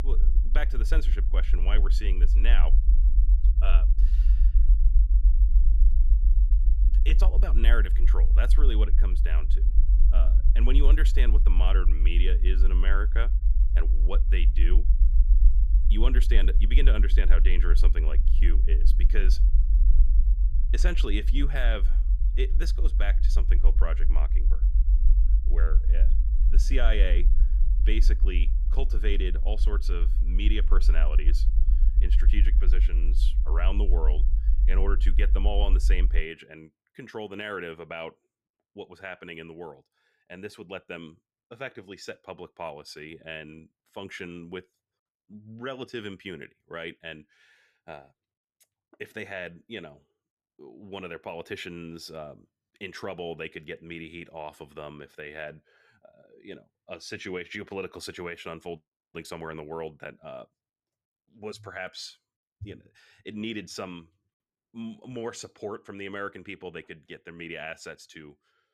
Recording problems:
low rumble; noticeable; until 36 s; 10 dB below the speech

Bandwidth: 14.5 kHz